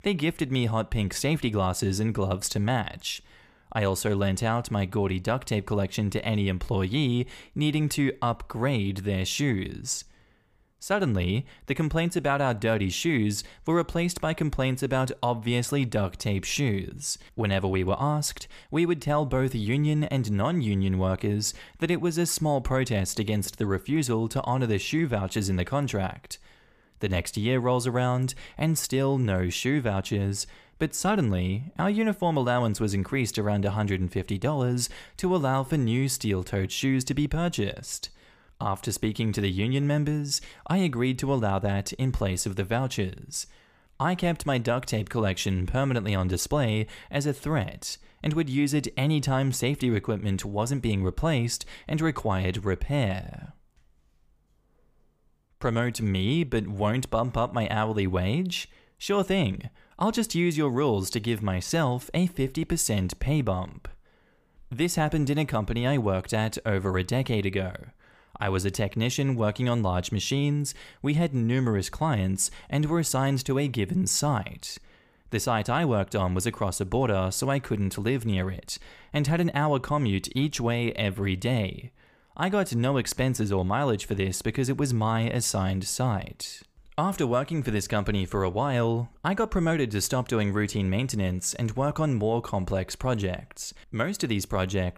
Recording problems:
none

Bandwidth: 15 kHz